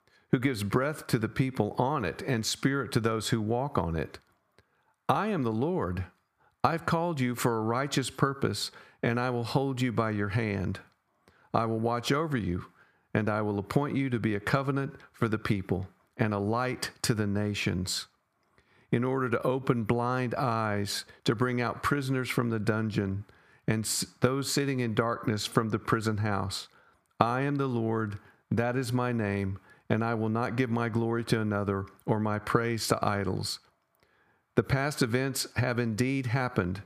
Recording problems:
squashed, flat; somewhat

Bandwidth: 15 kHz